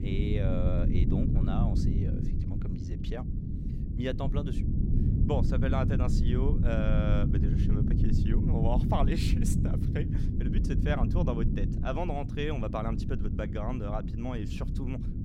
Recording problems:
low rumble; loud; throughout; 3 dB below the speech

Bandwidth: 16 kHz